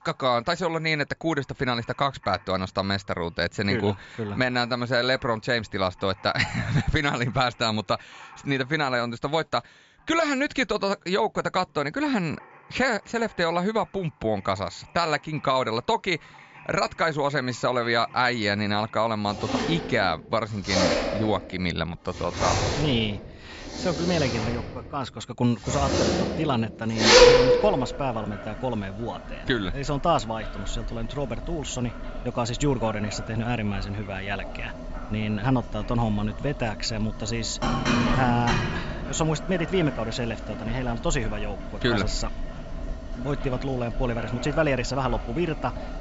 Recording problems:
high frequencies cut off; noticeable; nothing above 7.5 kHz
household noises; loud; throughout; 1 dB below the speech

